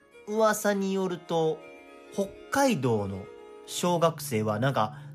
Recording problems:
background music; noticeable; throughout; 20 dB below the speech

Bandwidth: 14.5 kHz